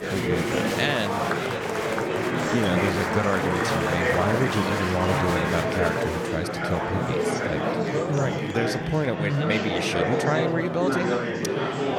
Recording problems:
murmuring crowd; very loud; throughout; 2 dB above the speech

